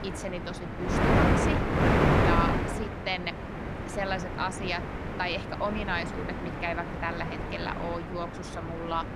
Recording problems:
wind noise on the microphone; heavy; 2 dB above the speech

